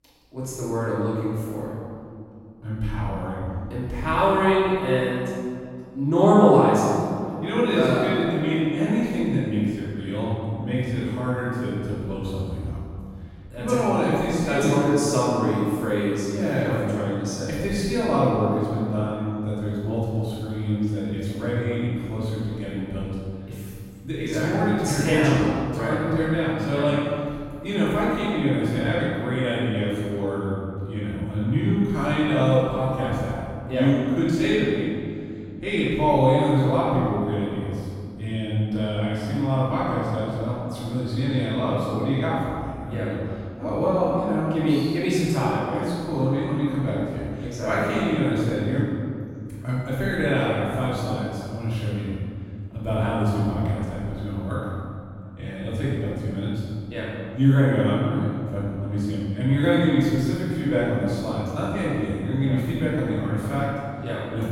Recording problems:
room echo; strong; dies away in 2.3 s
off-mic speech; far

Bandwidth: 16 kHz